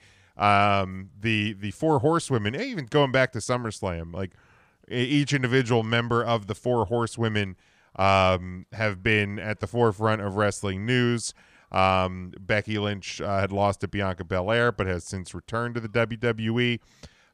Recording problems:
none

